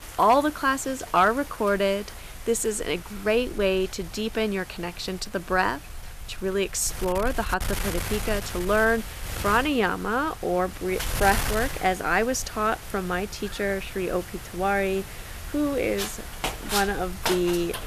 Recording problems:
wind noise on the microphone; occasional gusts; 10 dB below the speech

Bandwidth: 14.5 kHz